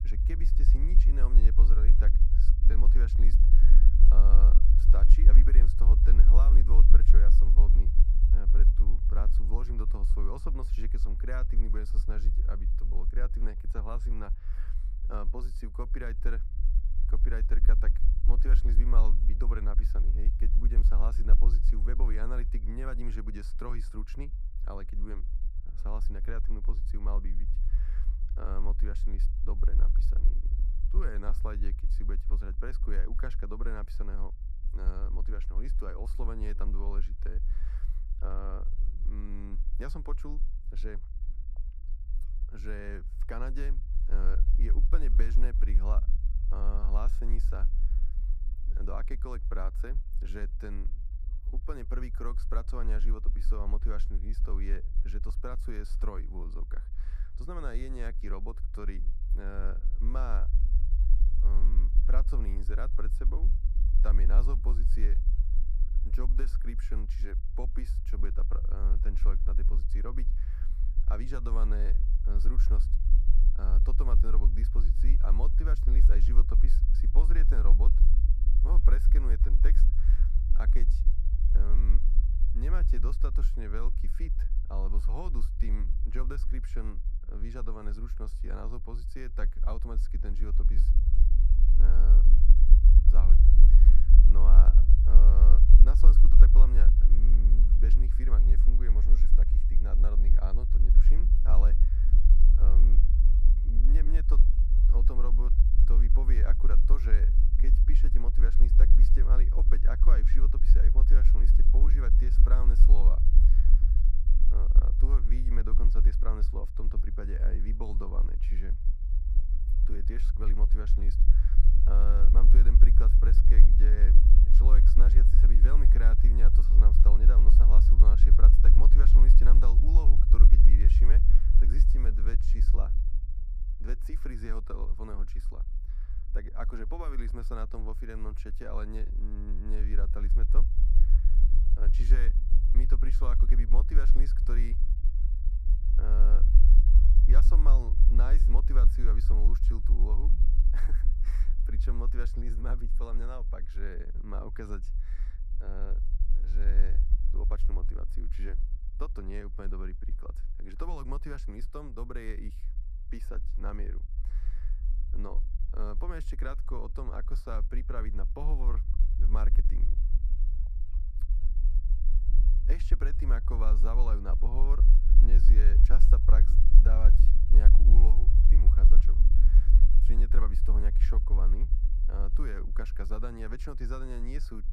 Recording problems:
low rumble; loud; throughout; 5 dB below the speech

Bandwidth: 14.5 kHz